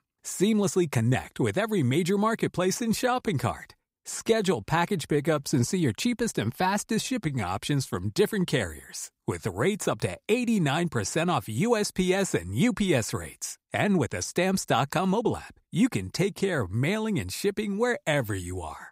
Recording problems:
uneven, jittery; strongly; from 0.5 to 18 s

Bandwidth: 15.5 kHz